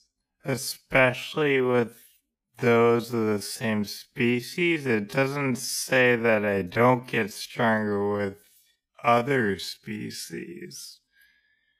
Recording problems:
wrong speed, natural pitch; too slow; 0.5 times normal speed

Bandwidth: 15 kHz